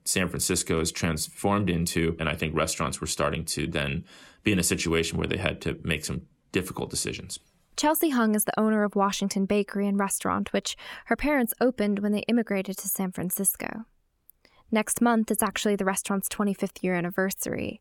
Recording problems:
none

